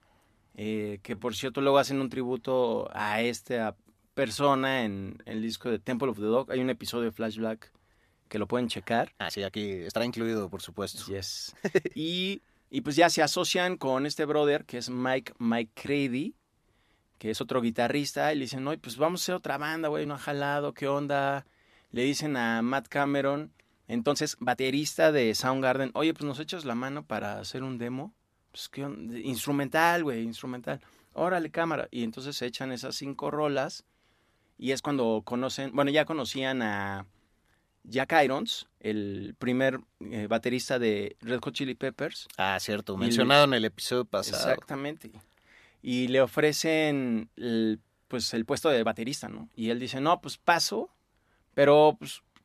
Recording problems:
uneven, jittery; strongly; from 1 to 49 s

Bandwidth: 14.5 kHz